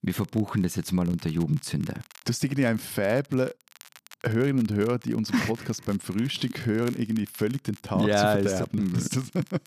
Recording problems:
crackle, like an old record; faint; 25 dB below the speech

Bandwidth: 14.5 kHz